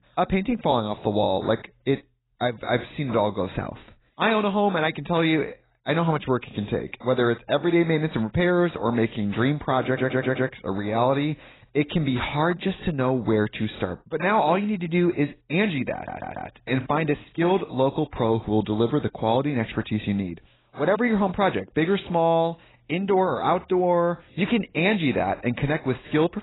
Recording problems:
garbled, watery; badly; nothing above 4 kHz
audio stuttering; at 10 s and at 16 s

